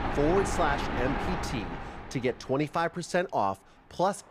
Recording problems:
rain or running water; loud; throughout; 3 dB below the speech

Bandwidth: 14.5 kHz